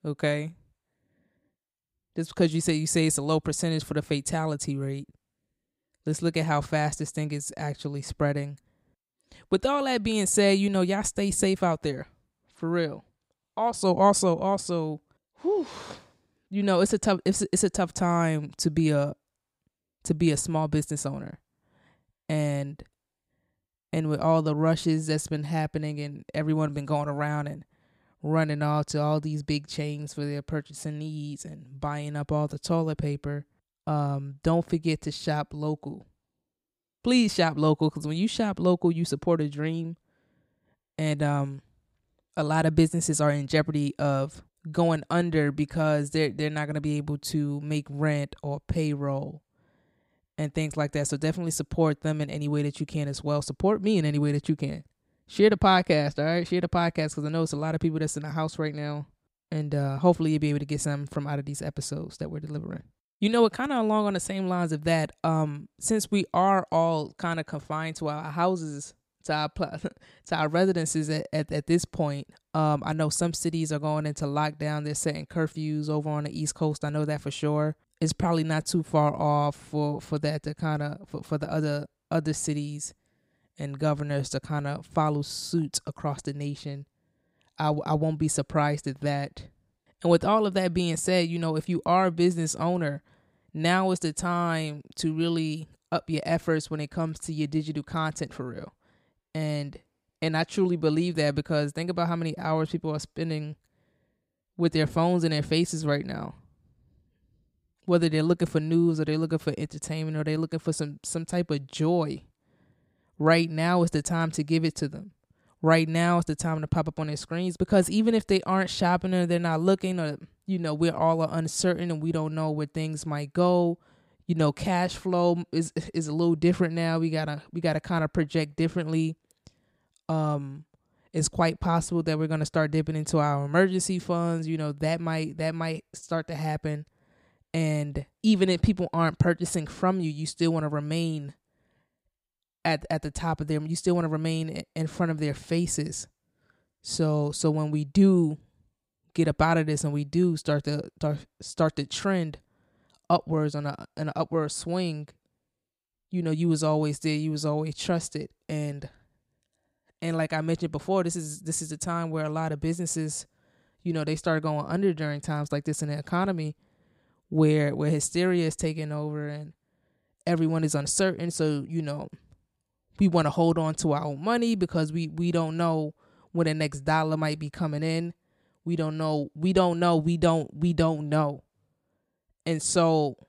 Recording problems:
none

